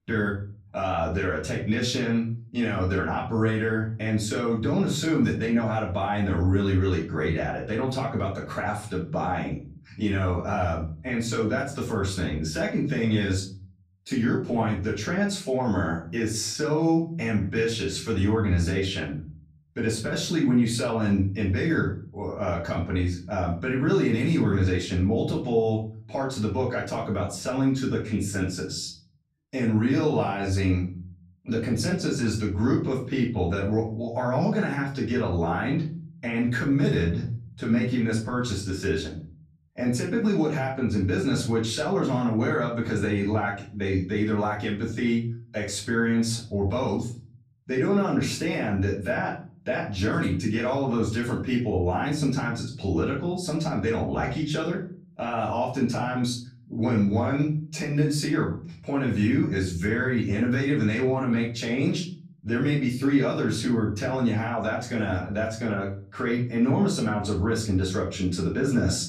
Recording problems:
off-mic speech; far
room echo; slight; dies away in 0.5 s

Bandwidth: 15.5 kHz